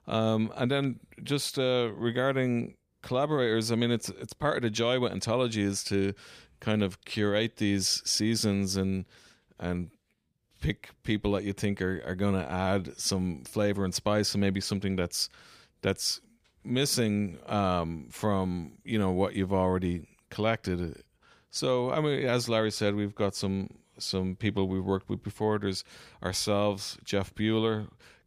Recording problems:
none

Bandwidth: 15 kHz